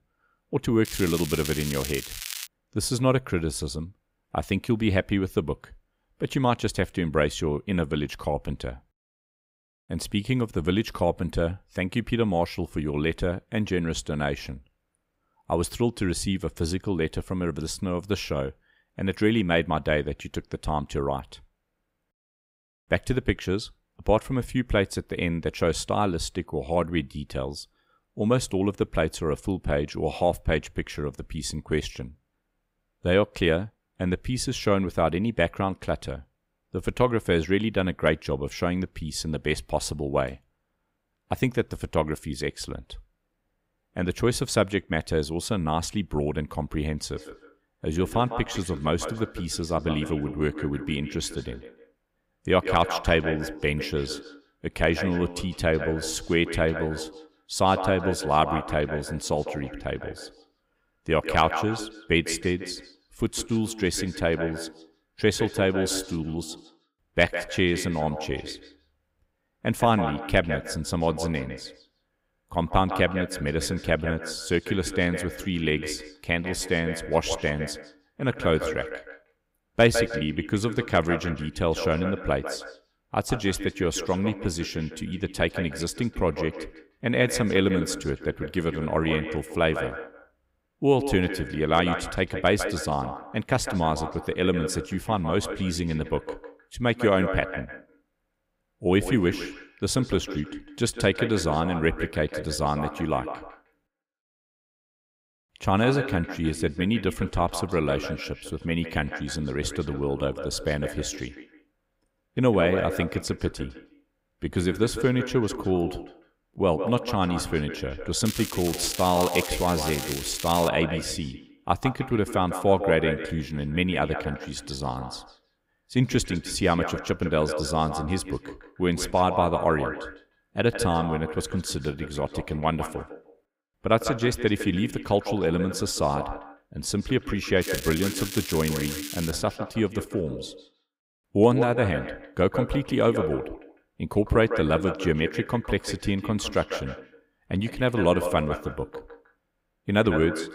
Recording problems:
echo of what is said; strong; from 47 s on; 150 ms later, 9 dB below the speech
crackling; loud; from 1 to 2.5 s, from 1:58 to 2:01 and from 2:18 to 2:19; 7 dB below the speech

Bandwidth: 15.5 kHz